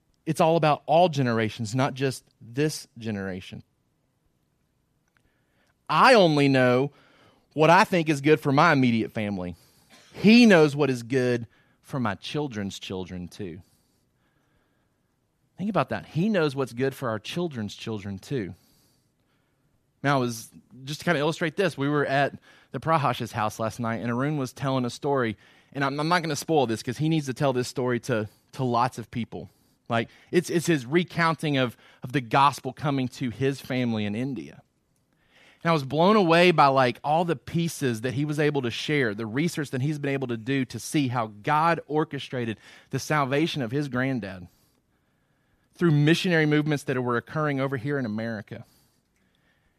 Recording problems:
none

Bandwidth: 14.5 kHz